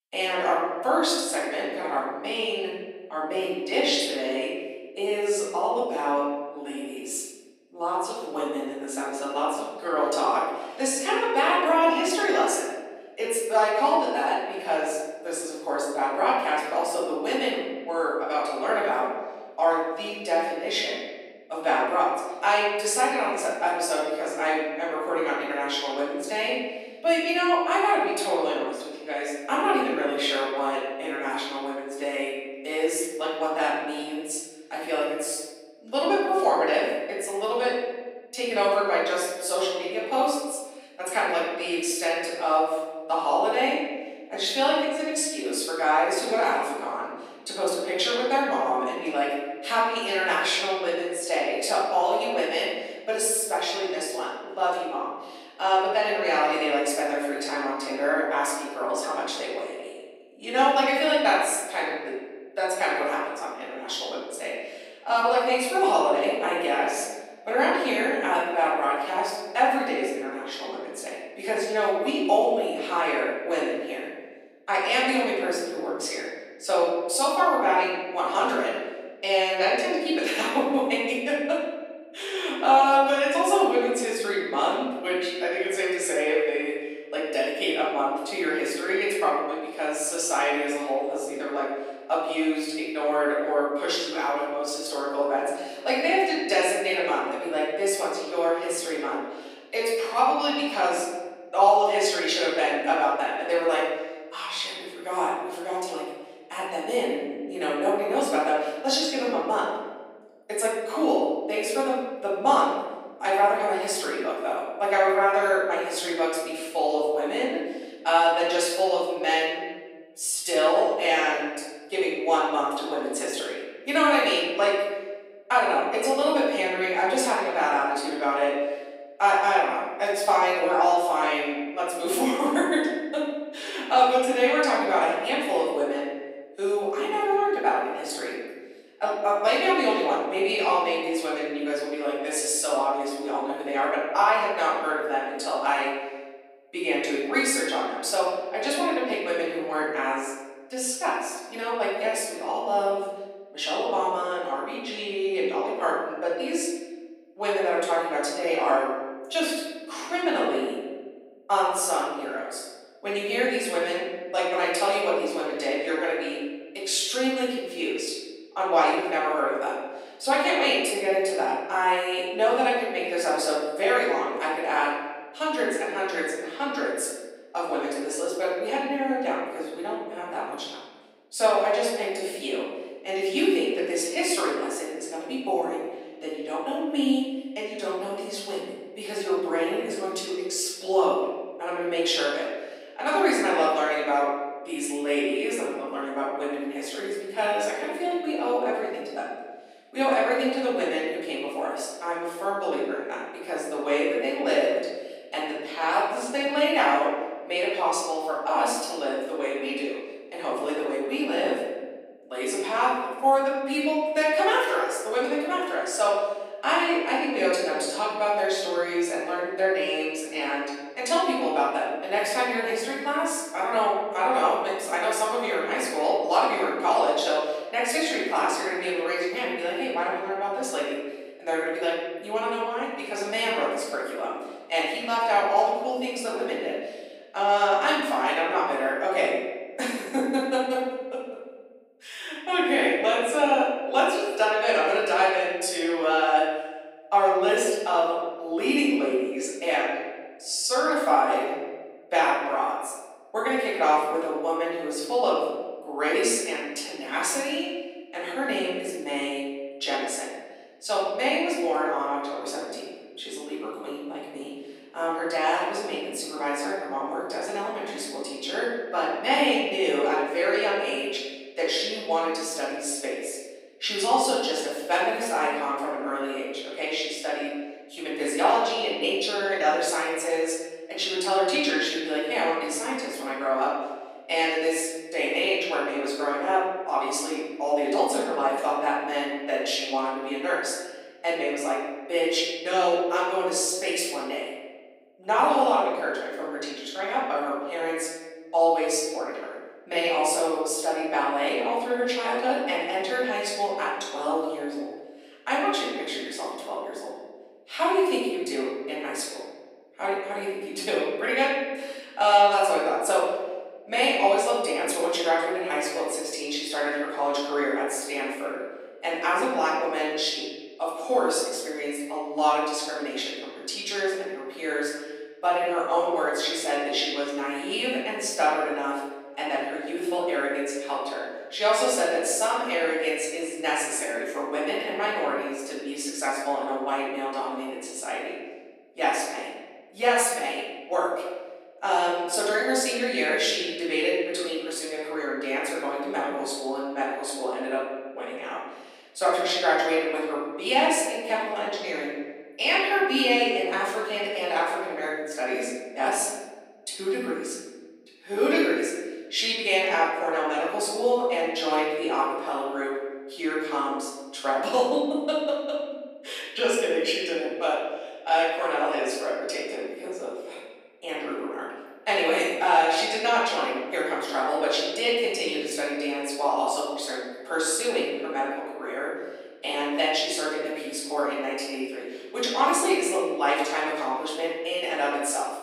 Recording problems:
off-mic speech; far
room echo; noticeable; dies away in 1.2 s
thin; very slightly; fading below 250 Hz

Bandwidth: 15.5 kHz